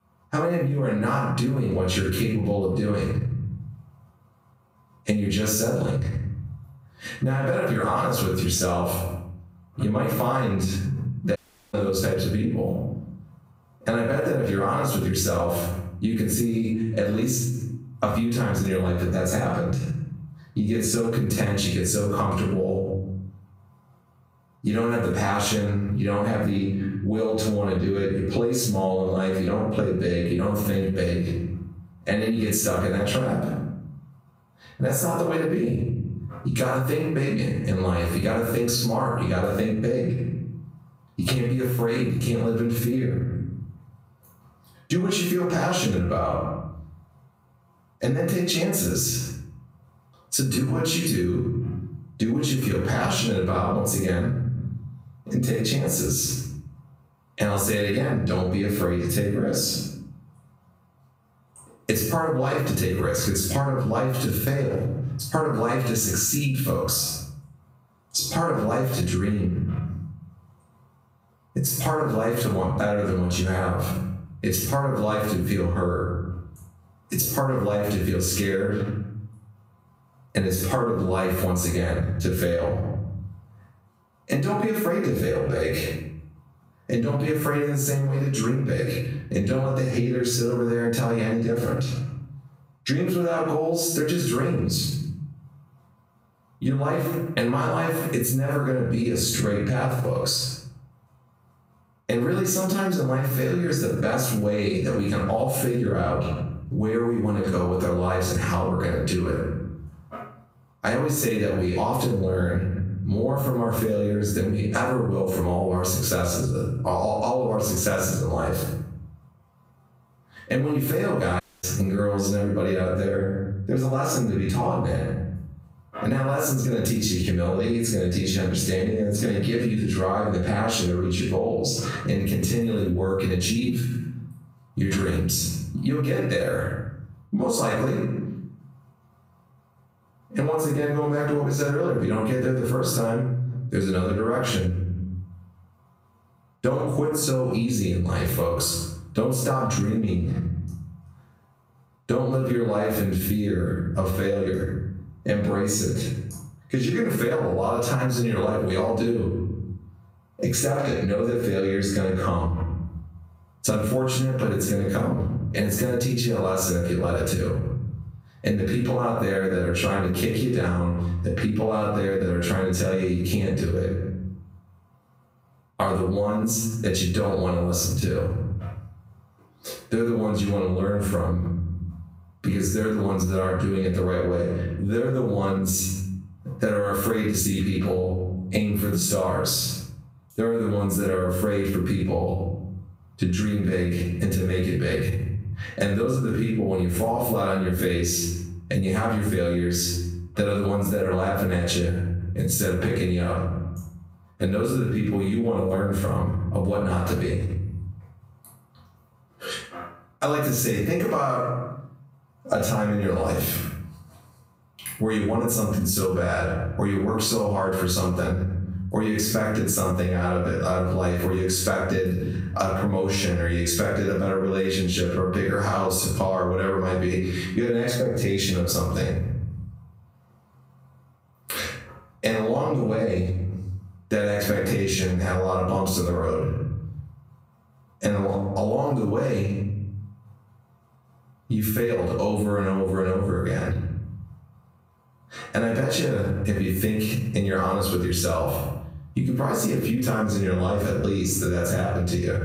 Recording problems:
off-mic speech; far
room echo; noticeable; dies away in 0.6 s
squashed, flat; somewhat
audio cutting out; at 11 s and at 2:01

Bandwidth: 15.5 kHz